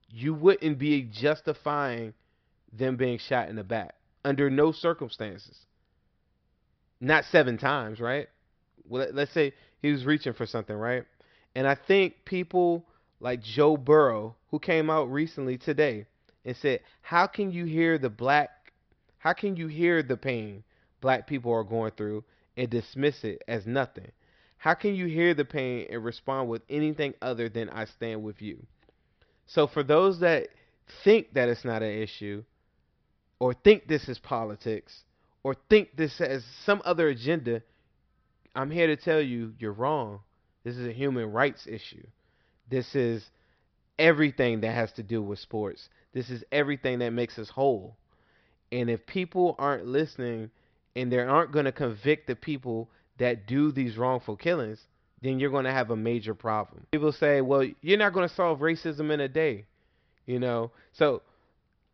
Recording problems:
high frequencies cut off; noticeable; nothing above 5.5 kHz

